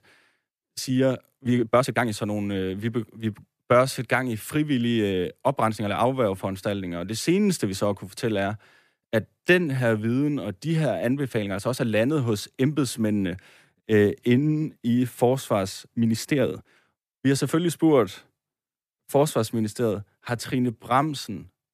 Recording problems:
uneven, jittery; strongly; from 0.5 to 21 s

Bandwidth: 14.5 kHz